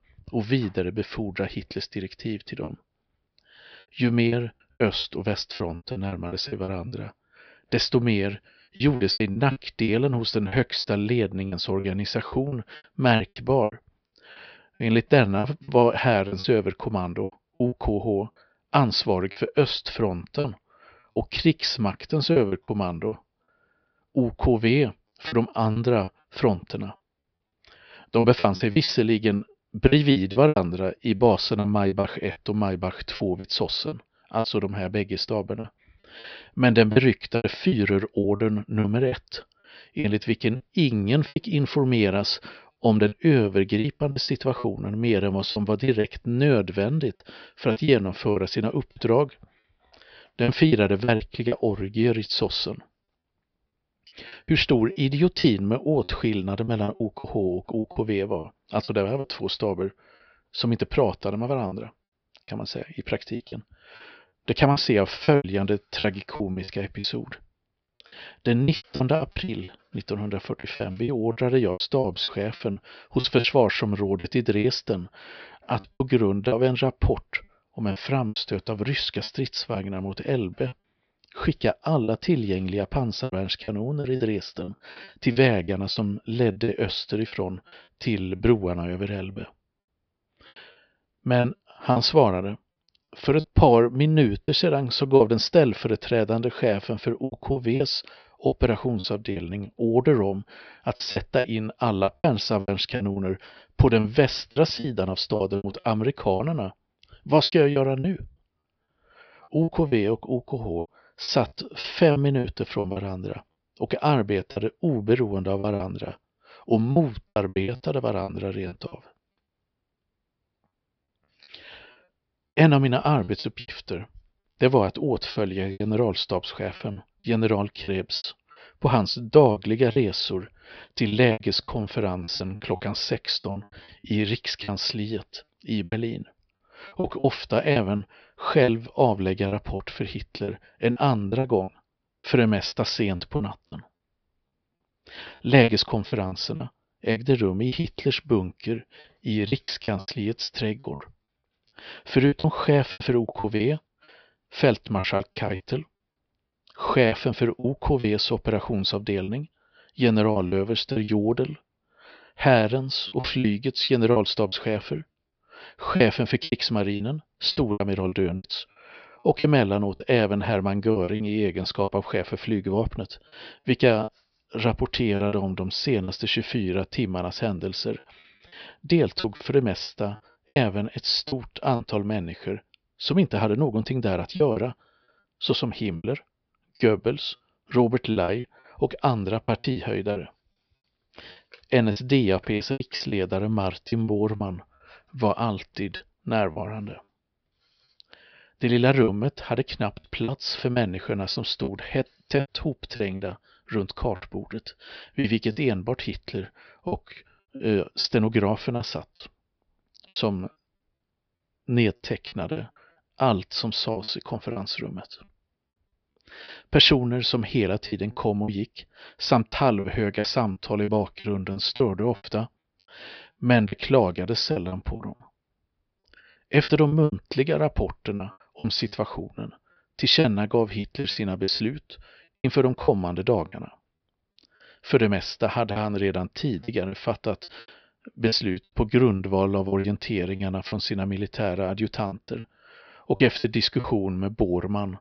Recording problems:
high frequencies cut off; noticeable; nothing above 5.5 kHz
choppy; very; 10% of the speech affected

